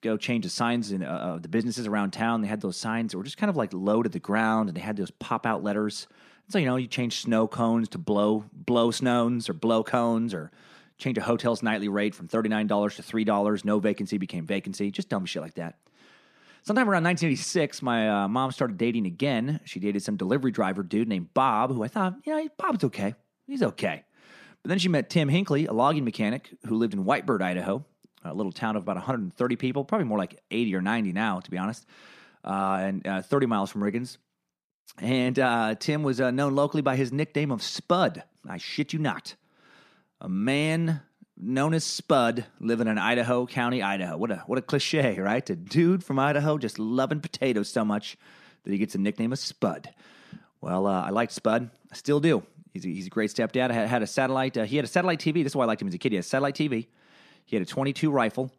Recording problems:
none

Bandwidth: 14.5 kHz